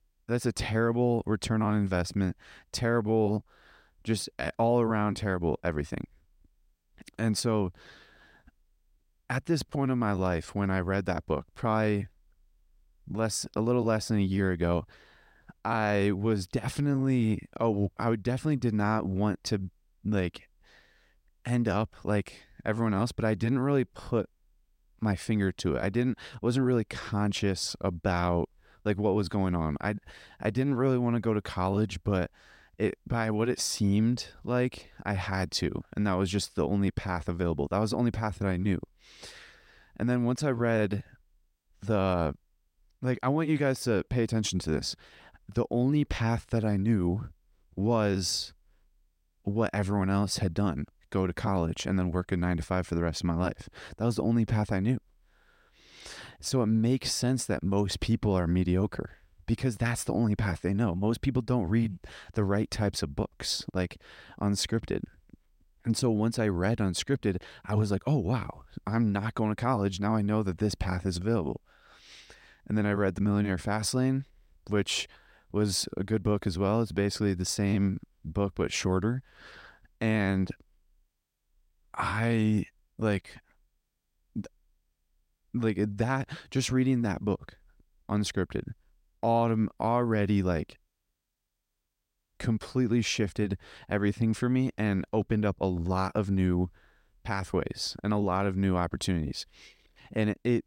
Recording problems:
none

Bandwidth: 16 kHz